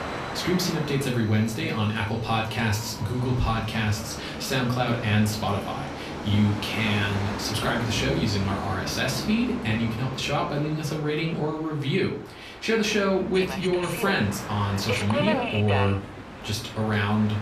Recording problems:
off-mic speech; far
room echo; slight; dies away in 0.3 s
train or aircraft noise; loud; throughout; 8 dB below the speech

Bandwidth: 14.5 kHz